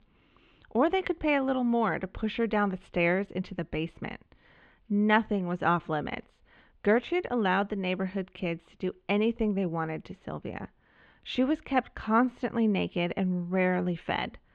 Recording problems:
muffled; slightly; fading above 3.5 kHz

